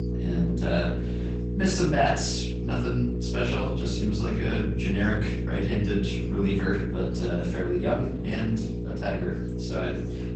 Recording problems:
off-mic speech; far
garbled, watery; badly; nothing above 8 kHz
room echo; noticeable; dies away in 0.5 s
electrical hum; loud; throughout; 60 Hz, 7 dB below the speech
chatter from many people; faint; throughout; 25 dB below the speech

